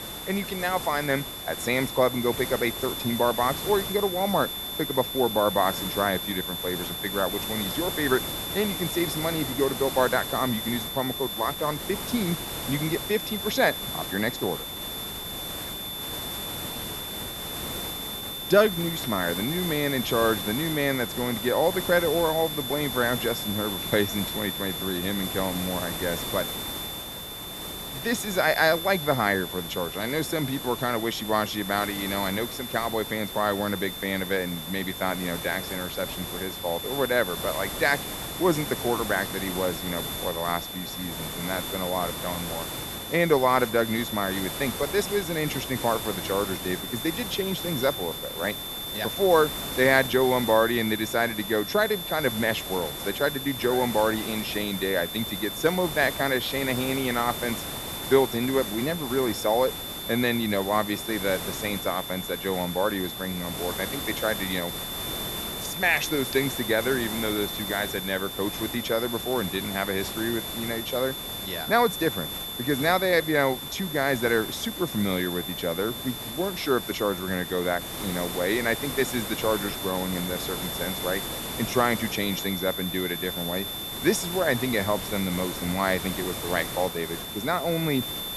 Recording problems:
high-pitched whine; loud; throughout; 3.5 kHz, 7 dB below the speech
hiss; loud; throughout; 9 dB below the speech

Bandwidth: 13.5 kHz